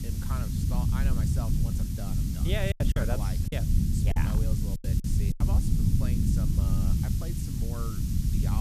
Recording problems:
hiss; loud; throughout; 4 dB below the speech
low rumble; loud; throughout; as loud as the speech
background chatter; faint; throughout; 2 voices, 30 dB below the speech
choppy; very; from 2.5 to 5.5 s; 11% of the speech affected
abrupt cut into speech; at the end

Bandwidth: 14.5 kHz